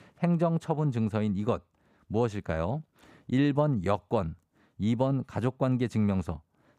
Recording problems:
none

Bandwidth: 15 kHz